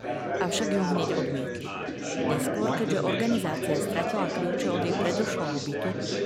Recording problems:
chatter from many people; very loud; throughout; 1 dB above the speech

